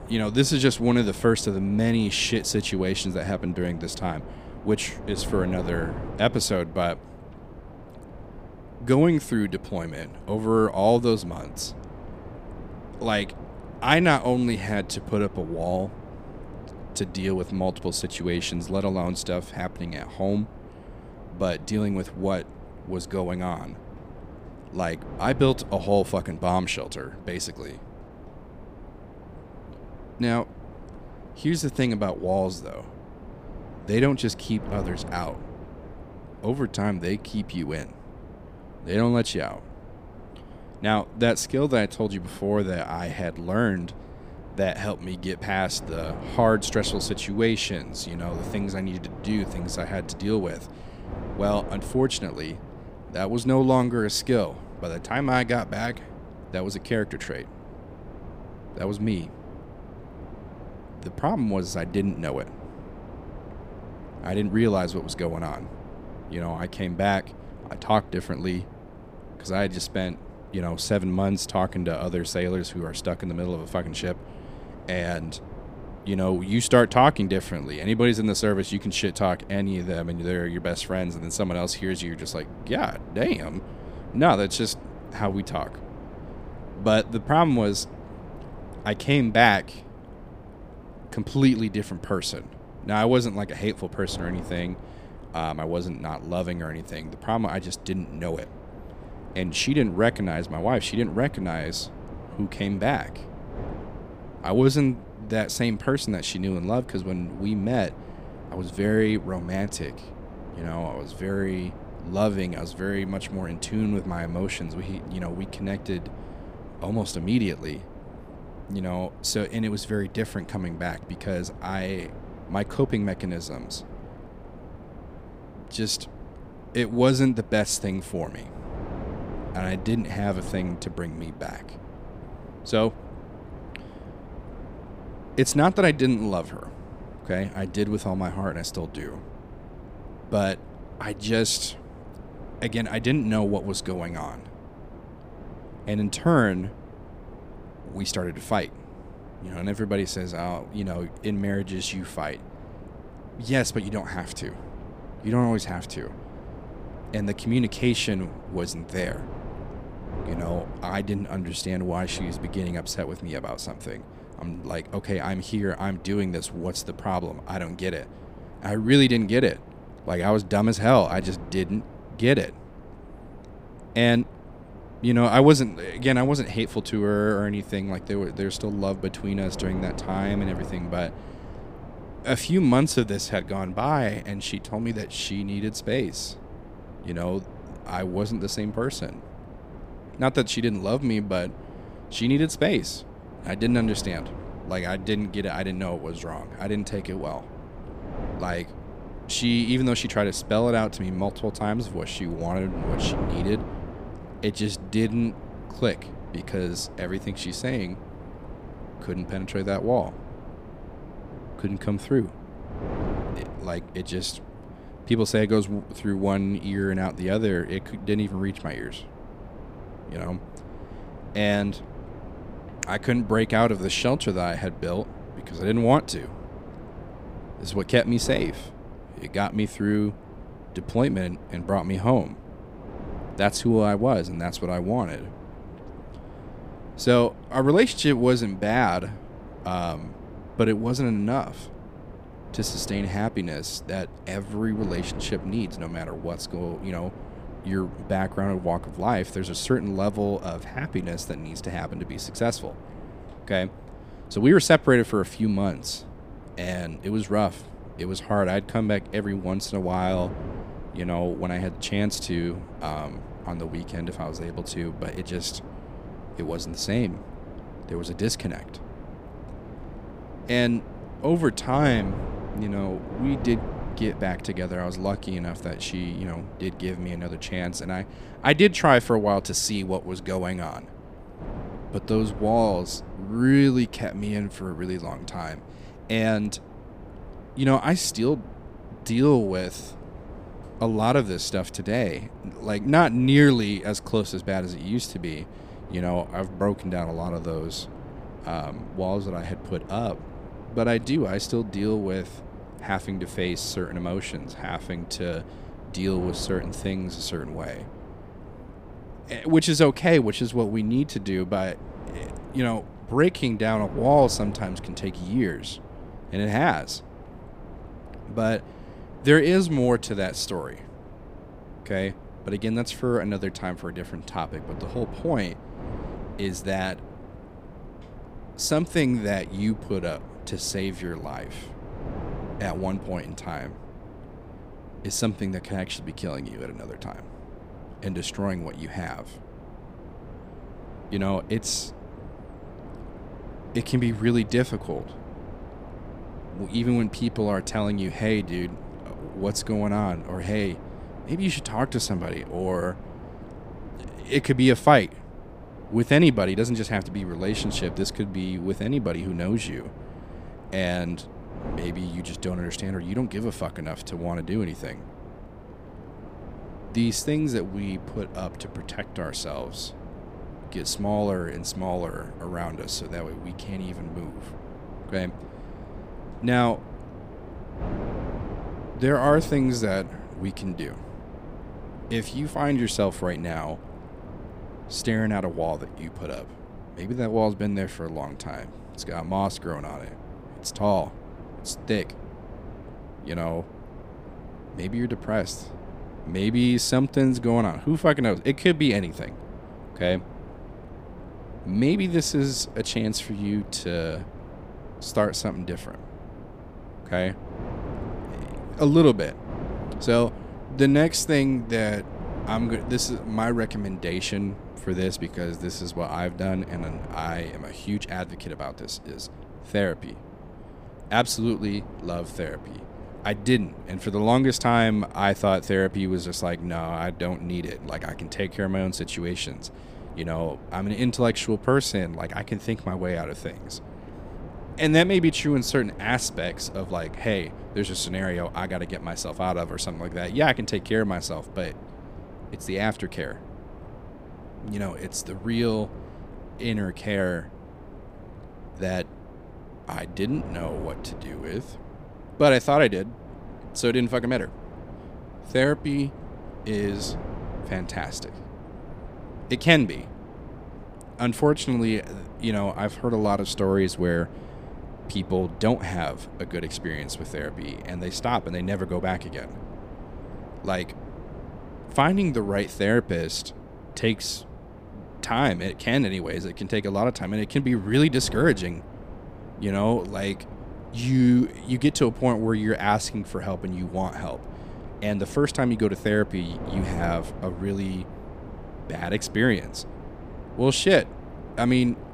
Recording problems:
wind noise on the microphone; occasional gusts; 15 dB below the speech

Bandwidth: 15 kHz